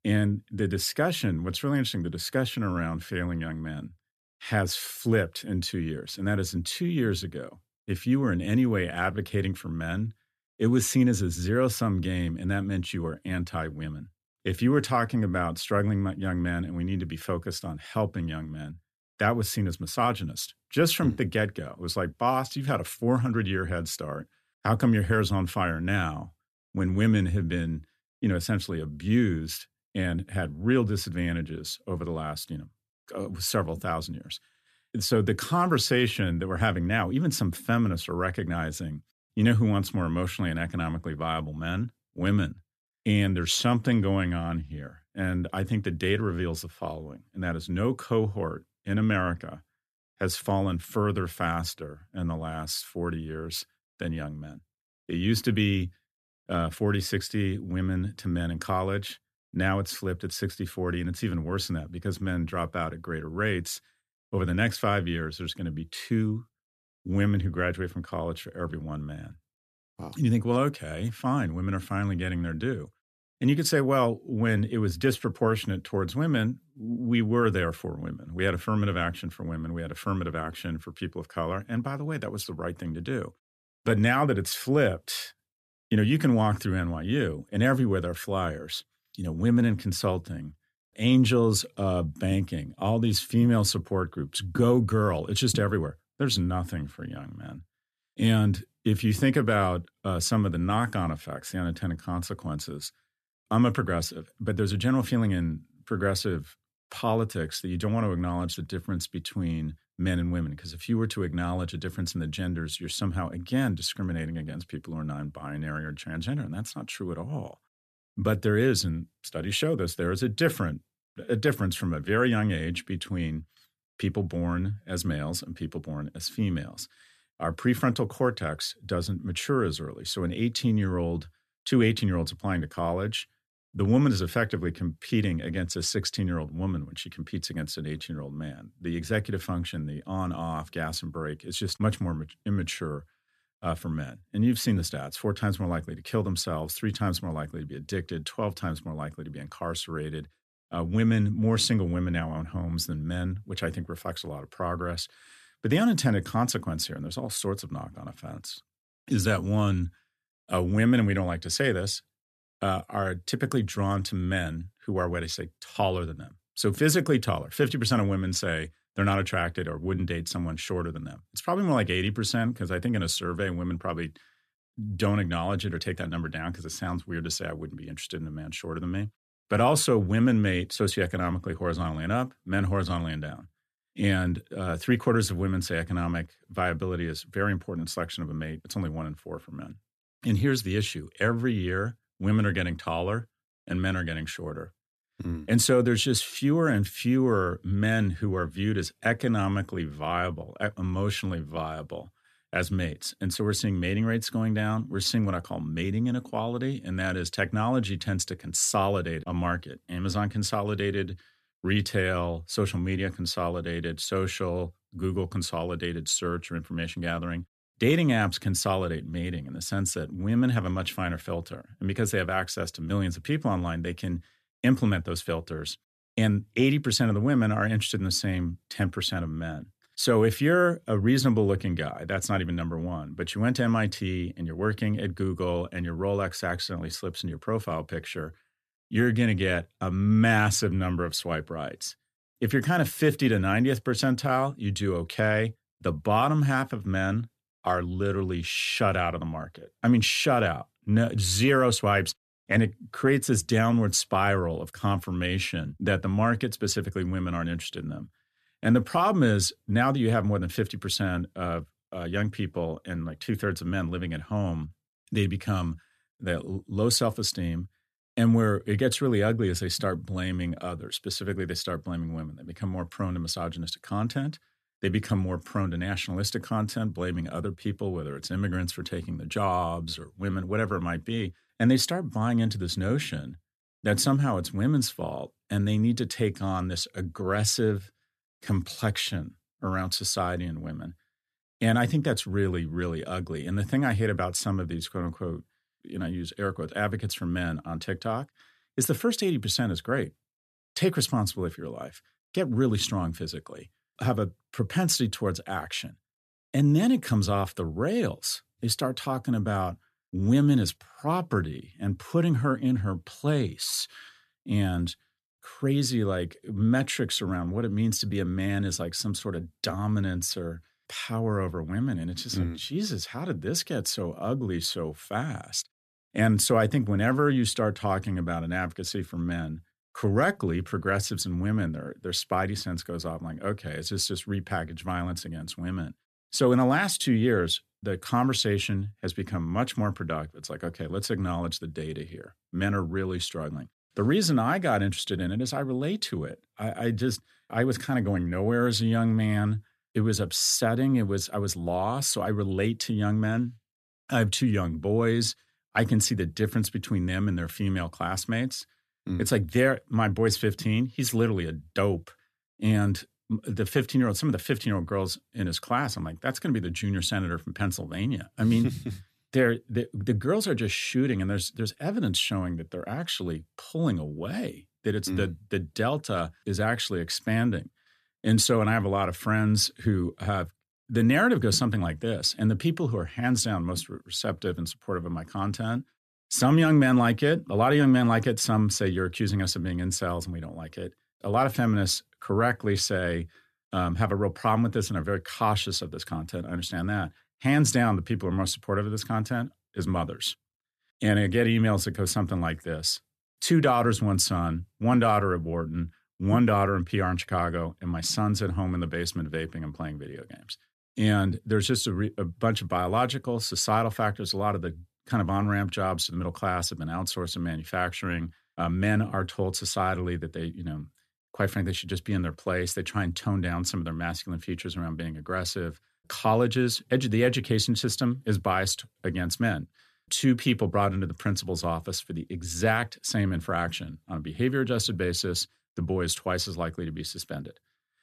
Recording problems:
none

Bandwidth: 14 kHz